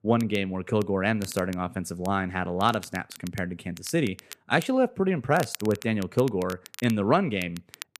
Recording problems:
crackle, like an old record; noticeable; 15 dB below the speech

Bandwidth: 14.5 kHz